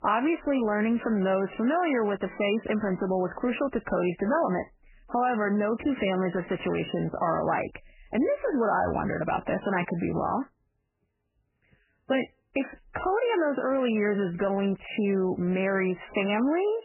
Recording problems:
garbled, watery; badly; nothing above 3 kHz

